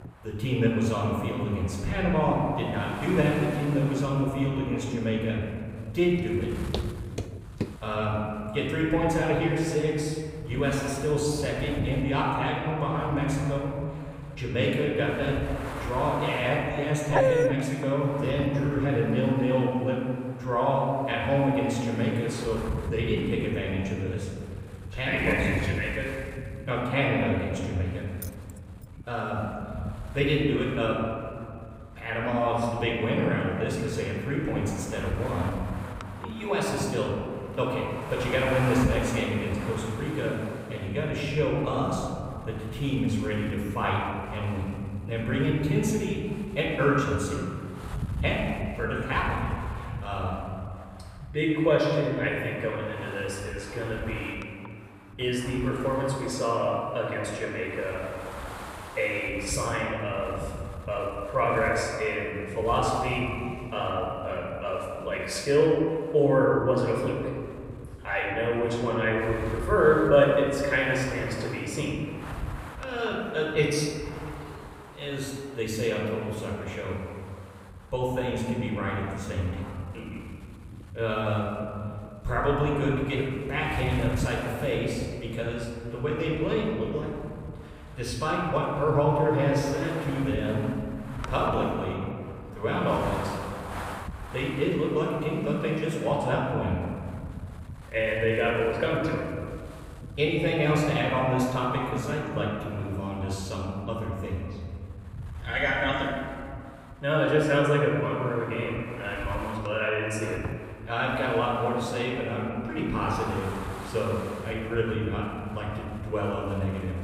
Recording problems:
off-mic speech; far
room echo; noticeable; dies away in 2.1 s
wind noise on the microphone; occasional gusts; 15 dB below the speech
footsteps; noticeable; from 6 to 8 s; peak 8 dB below the speech
dog barking; loud; at 17 s; peak 5 dB above the speech
jangling keys; faint; at 28 s; peak 15 dB below the speech

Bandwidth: 15.5 kHz